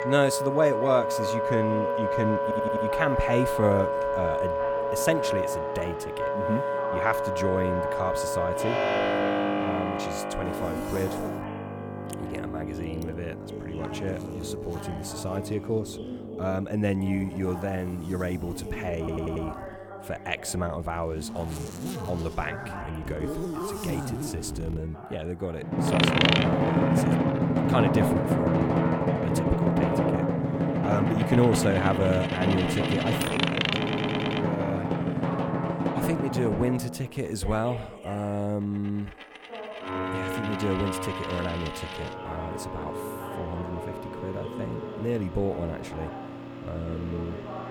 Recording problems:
background music; very loud; throughout; 3 dB above the speech
household noises; loud; throughout; 6 dB below the speech
voice in the background; noticeable; throughout; 10 dB below the speech
audio stuttering; at 2.5 s, at 19 s and at 34 s

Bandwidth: 17.5 kHz